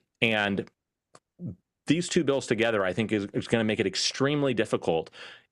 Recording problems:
squashed, flat; somewhat

